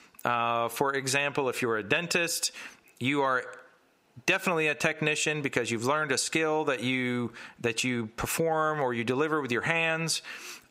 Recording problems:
squashed, flat; heavily
thin; very slightly; fading below 400 Hz

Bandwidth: 15.5 kHz